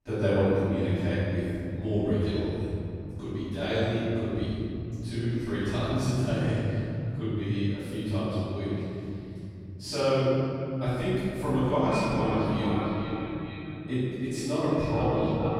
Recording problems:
echo of what is said; strong; from 12 s on; 450 ms later, 6 dB below the speech
room echo; strong; dies away in 3 s
off-mic speech; far

